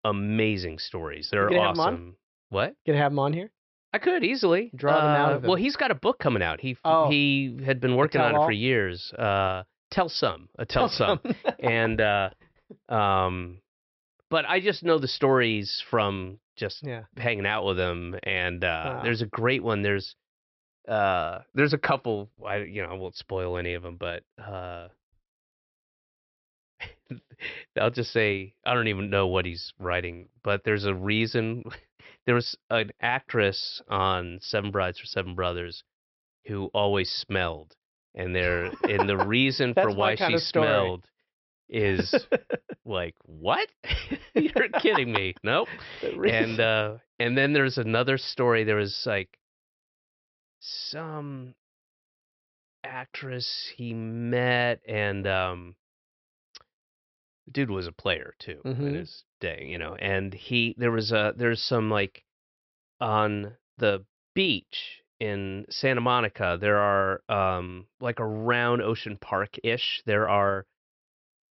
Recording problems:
high frequencies cut off; noticeable; nothing above 5.5 kHz

